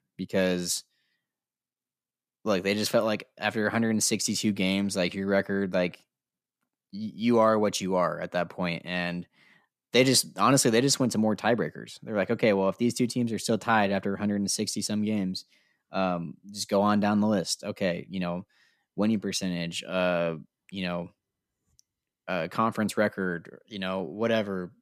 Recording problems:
none

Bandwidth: 14.5 kHz